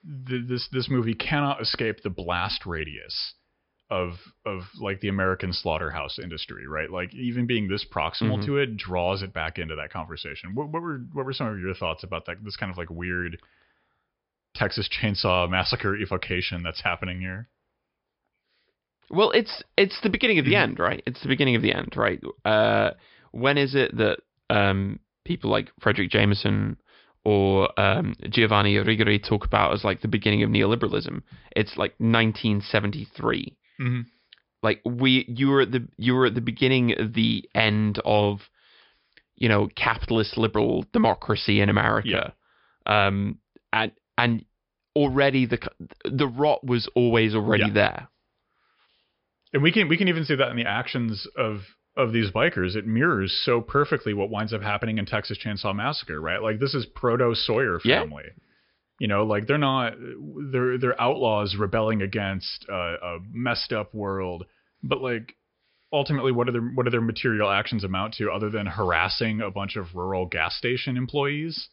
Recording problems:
high frequencies cut off; noticeable; nothing above 5 kHz

